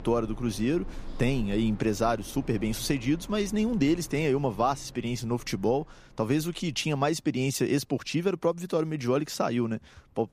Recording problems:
household noises; noticeable; throughout; 20 dB below the speech

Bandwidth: 15 kHz